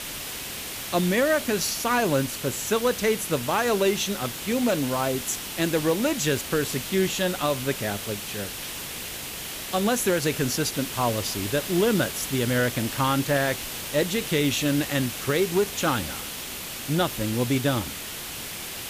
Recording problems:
hiss; loud; throughout; 7 dB below the speech

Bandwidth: 15 kHz